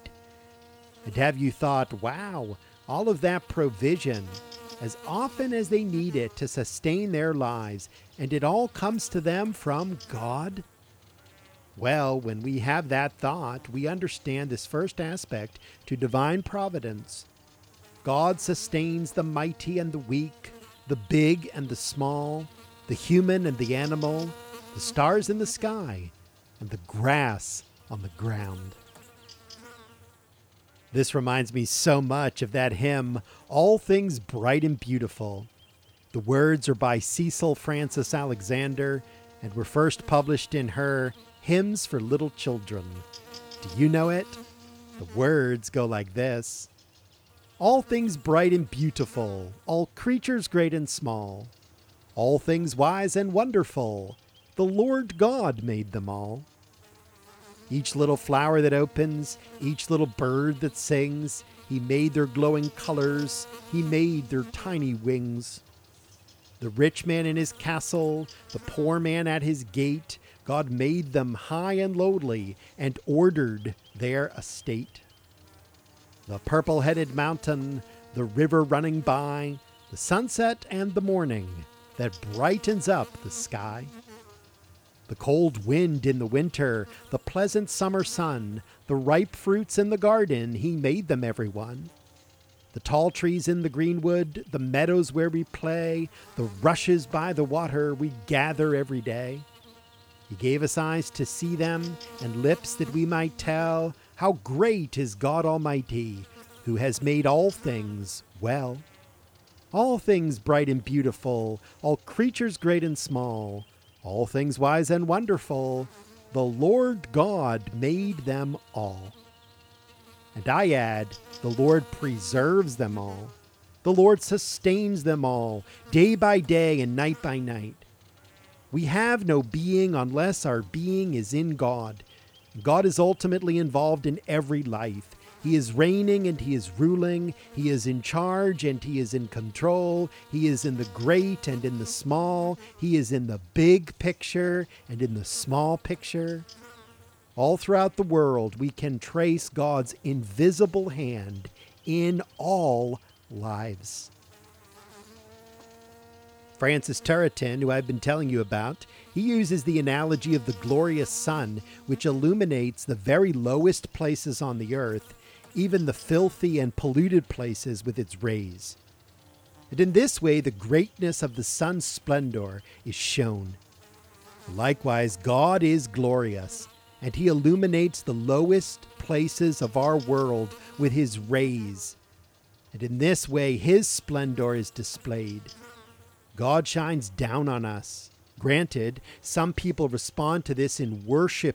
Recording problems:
electrical hum; faint; throughout; 60 Hz, 25 dB below the speech

